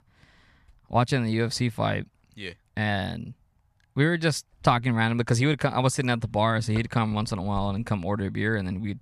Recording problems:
none

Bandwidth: 14.5 kHz